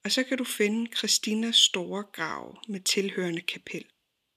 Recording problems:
thin; very slightly; fading below 1 kHz

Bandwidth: 14.5 kHz